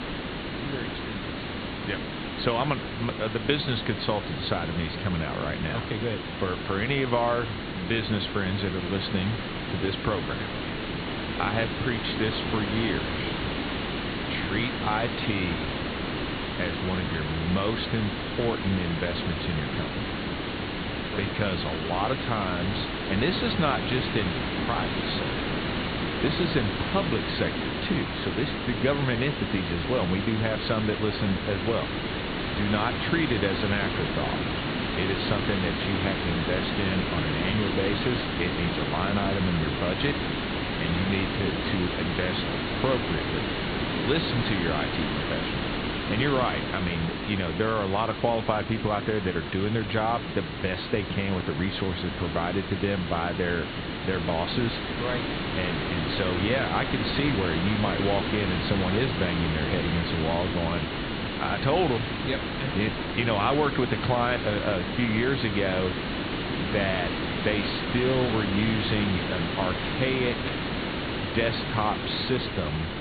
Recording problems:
high frequencies cut off; severe; nothing above 4.5 kHz
hiss; loud; throughout; 1 dB below the speech

